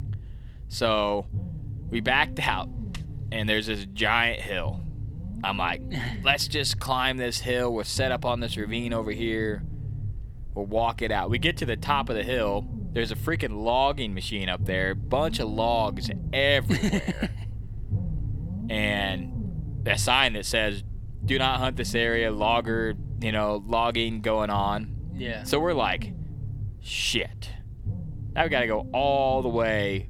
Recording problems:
low rumble; faint; throughout; 20 dB below the speech

